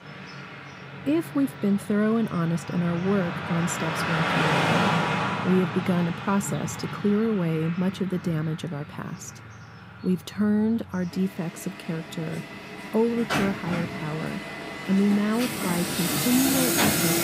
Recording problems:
traffic noise; loud; throughout; 1 dB below the speech

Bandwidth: 15.5 kHz